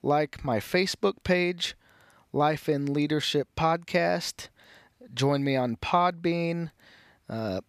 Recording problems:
none

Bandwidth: 14.5 kHz